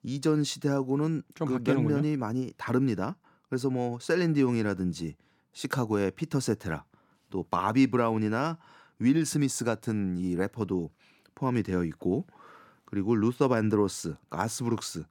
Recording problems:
none

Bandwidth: 17 kHz